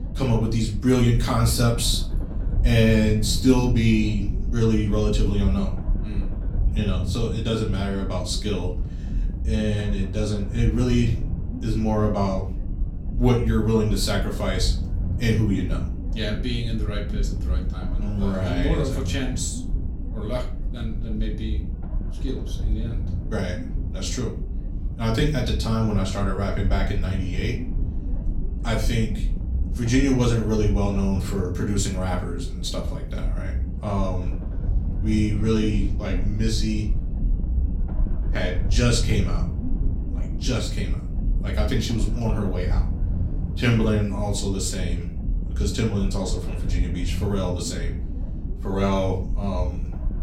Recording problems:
off-mic speech; far
room echo; slight; dies away in 0.4 s
low rumble; noticeable; throughout; 15 dB below the speech

